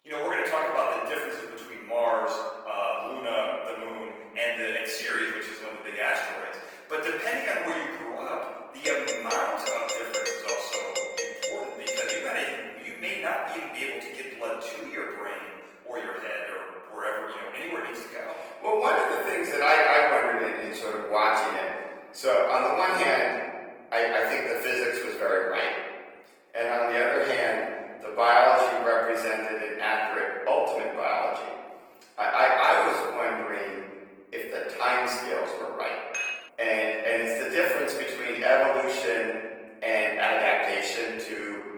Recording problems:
off-mic speech; far
thin; very; fading below 500 Hz
room echo; noticeable; dies away in 1.5 s
garbled, watery; slightly; nothing above 19 kHz
doorbell; noticeable; from 9 to 12 s; peak 3 dB below the speech
clattering dishes; noticeable; at 36 s; peak 3 dB below the speech

